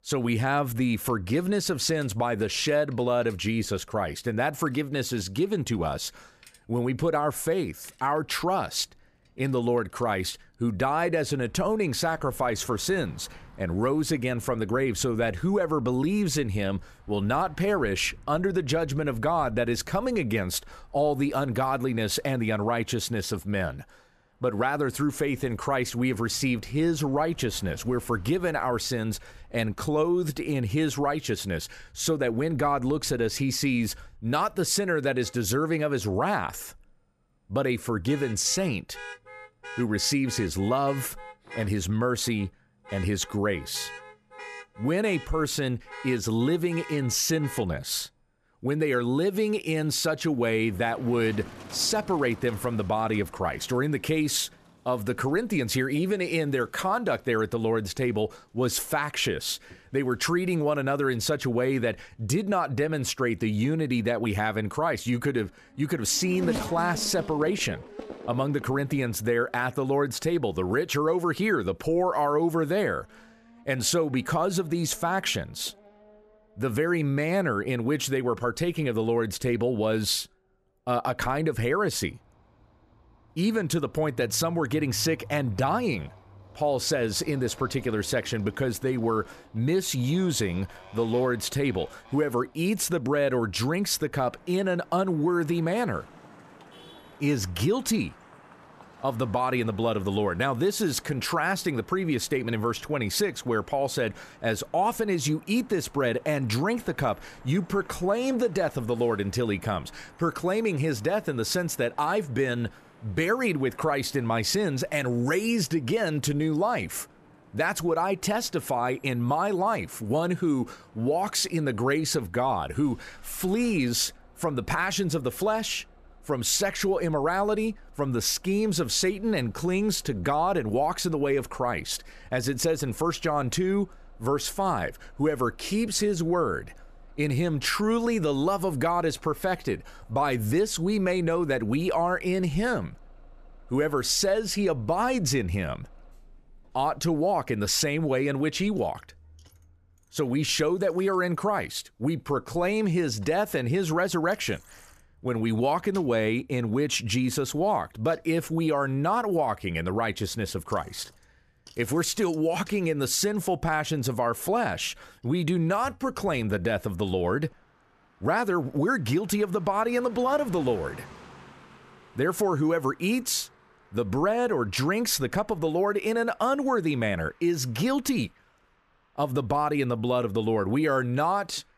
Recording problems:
traffic noise; faint; throughout; 20 dB below the speech

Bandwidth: 14.5 kHz